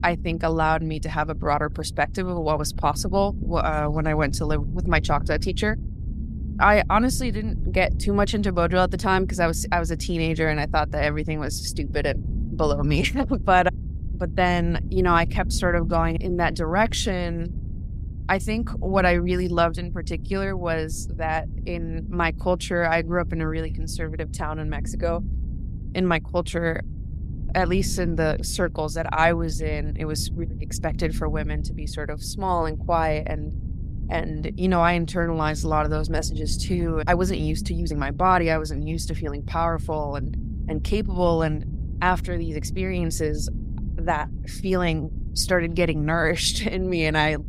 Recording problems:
low rumble; faint; throughout; 20 dB below the speech

